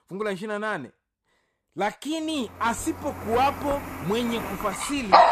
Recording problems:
animal sounds; very loud; from 3 s on; as loud as the speech

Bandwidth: 14.5 kHz